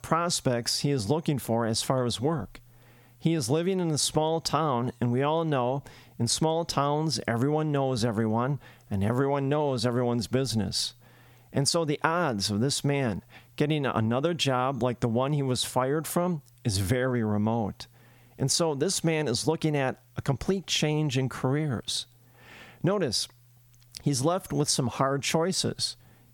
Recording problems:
squashed, flat; somewhat

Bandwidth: 18 kHz